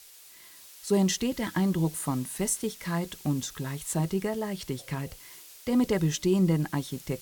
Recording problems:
hiss; noticeable; throughout; 20 dB below the speech

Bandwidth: 18 kHz